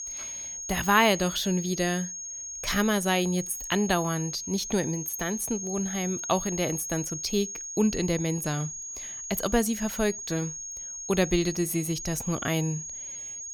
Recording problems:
high-pitched whine; loud; throughout; 6.5 kHz, 6 dB below the speech

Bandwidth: 18 kHz